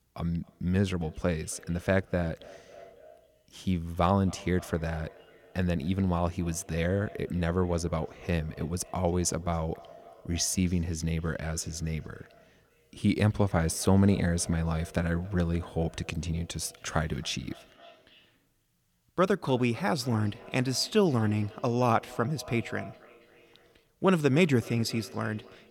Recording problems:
echo of what is said; faint; throughout; 270 ms later, 20 dB below the speech

